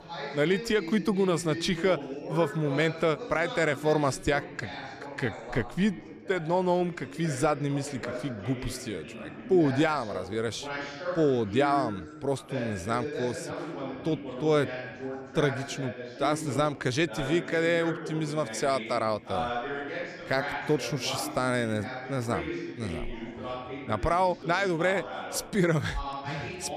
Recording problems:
background chatter; loud; throughout; 4 voices, 9 dB below the speech

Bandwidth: 14.5 kHz